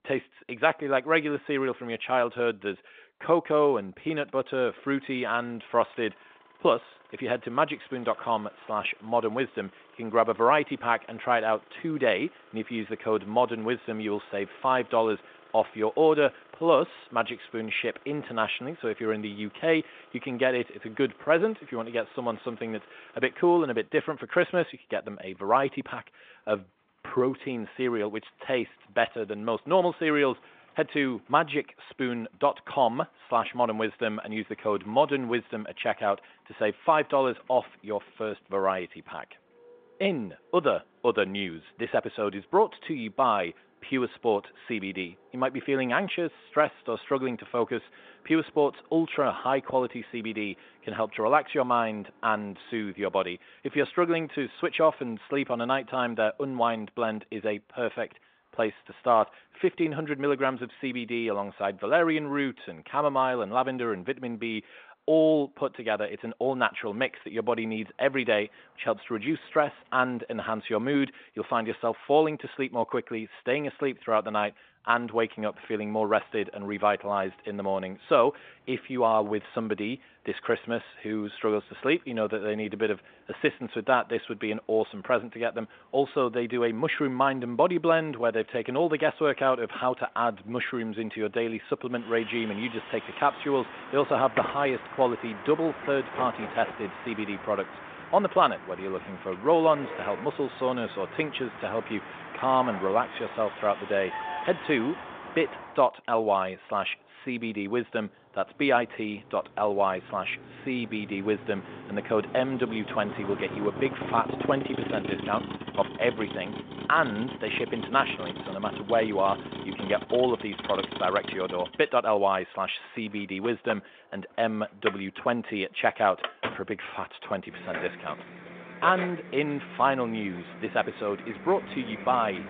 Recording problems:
phone-call audio; nothing above 3.5 kHz
traffic noise; noticeable; throughout; 10 dB below the speech

